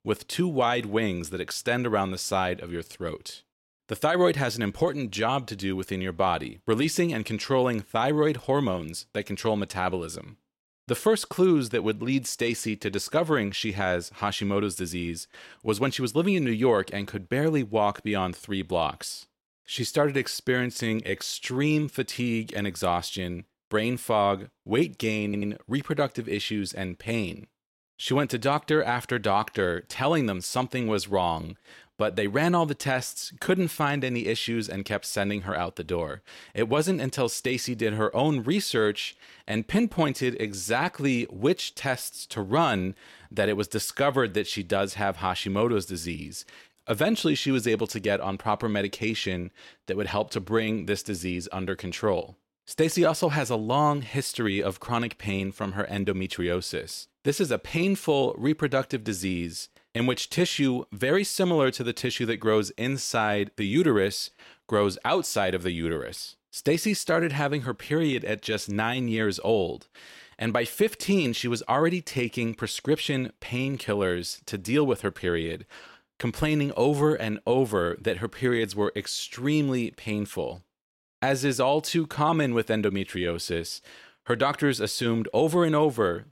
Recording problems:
audio stuttering; at 25 s

